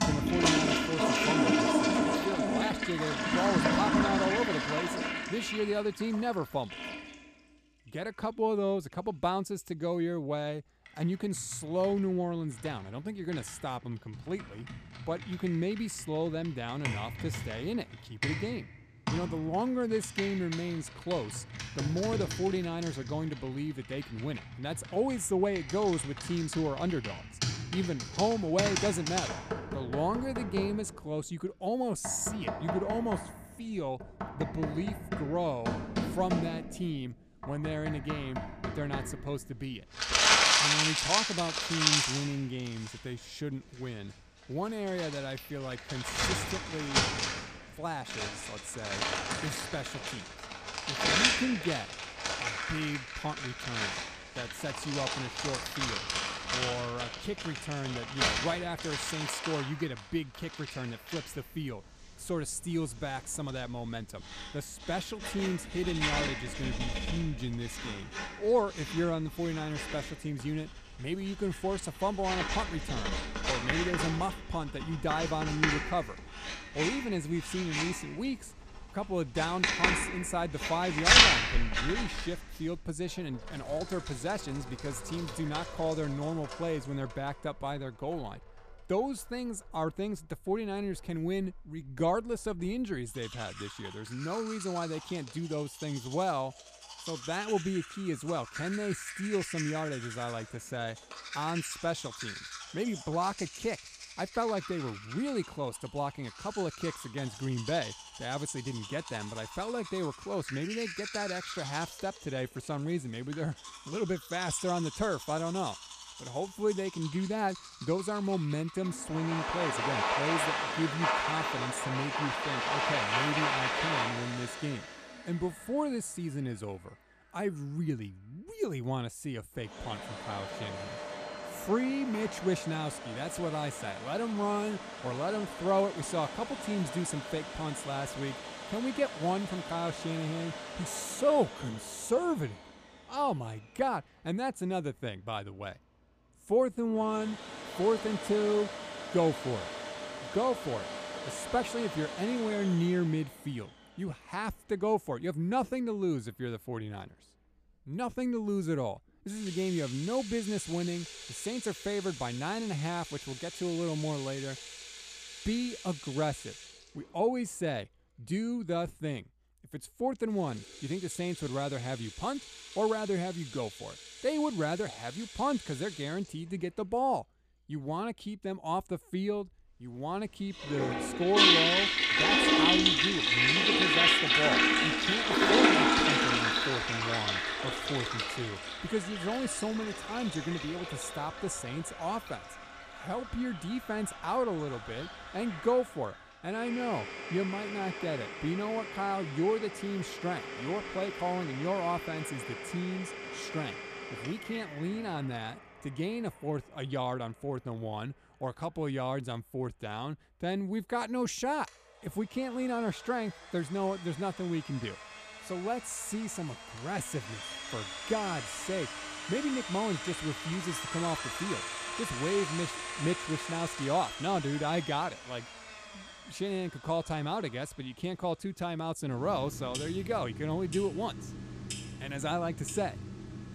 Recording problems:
household noises; very loud; throughout; 2 dB above the speech

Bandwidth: 14.5 kHz